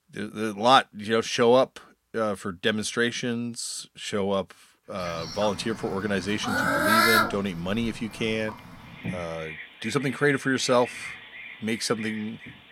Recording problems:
animal sounds; loud; from 5 s on; 3 dB below the speech

